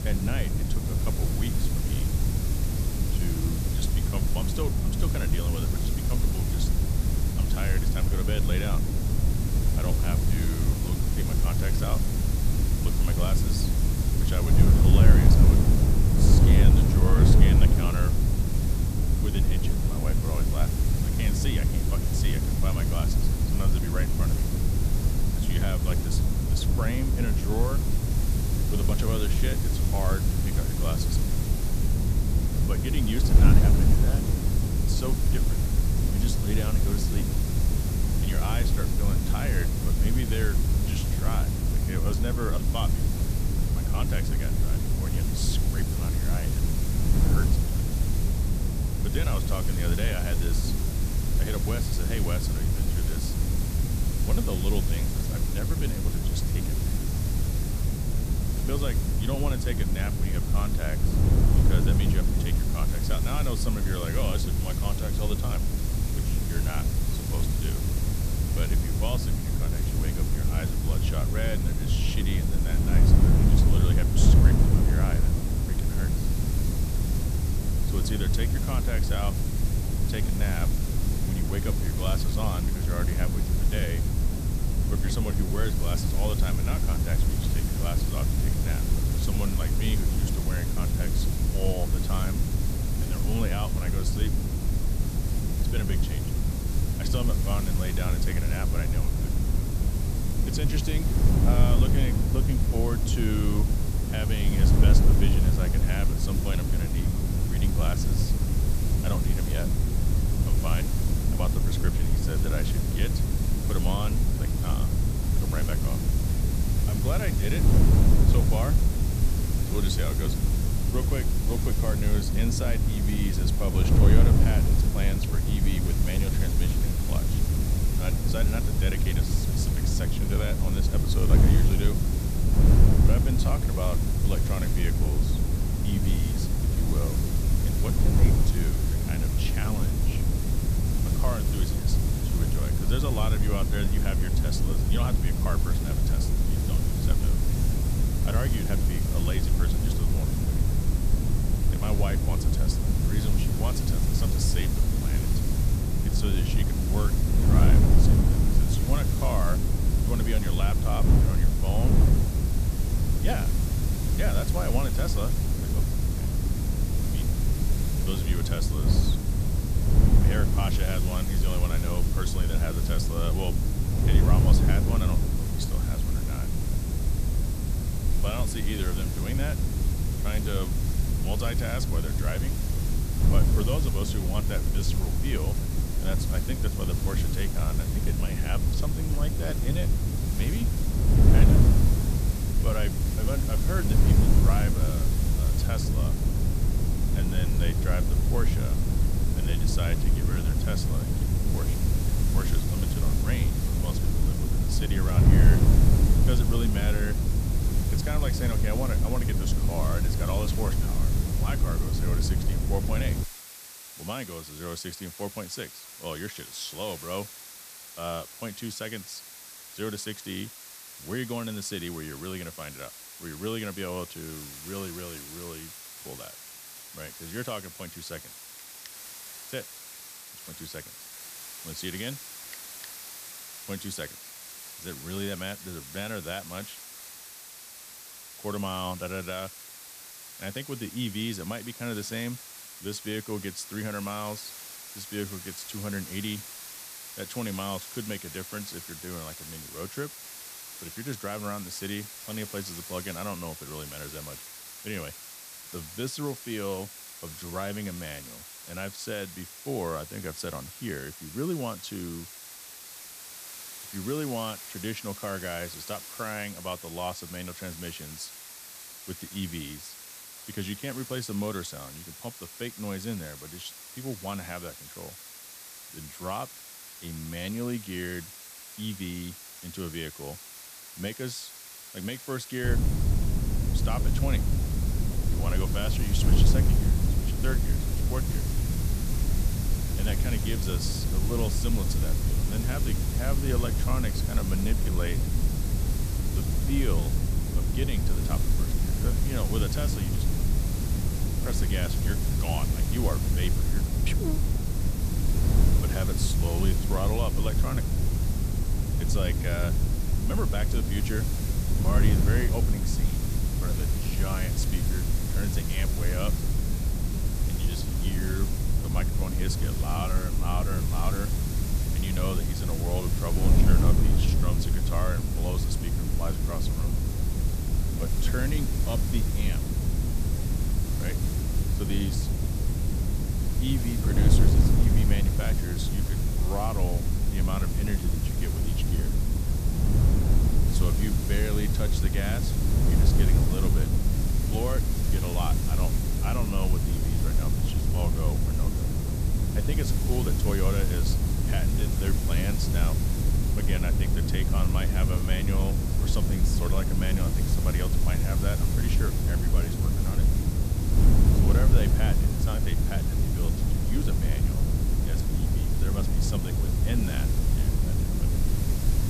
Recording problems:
wind noise on the microphone; heavy; until 3:33 and from 4:43 on; 2 dB below the speech
hiss; loud; throughout; 4 dB below the speech
high-pitched whine; noticeable; throughout; 8 kHz, 20 dB below the speech

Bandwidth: 14.5 kHz